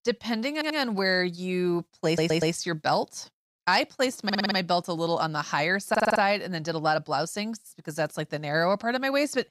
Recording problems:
audio stuttering; 4 times, first at 0.5 s

